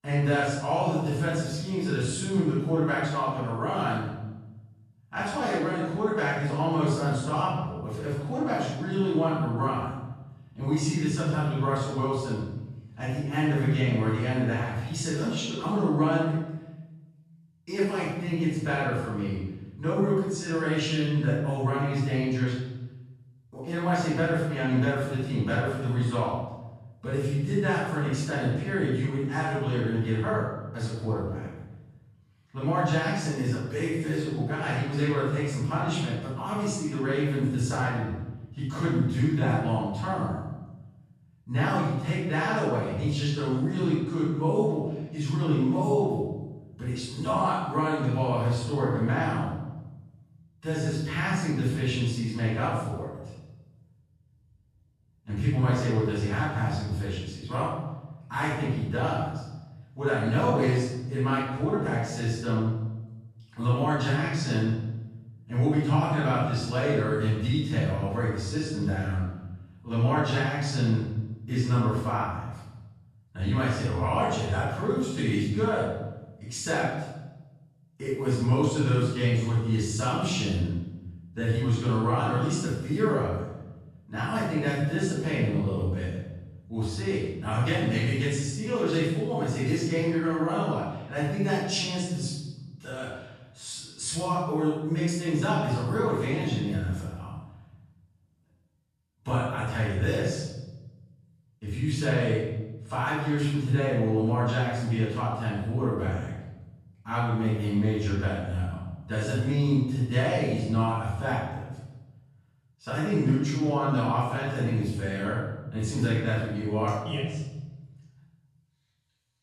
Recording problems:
room echo; strong; dies away in 1 s
off-mic speech; far

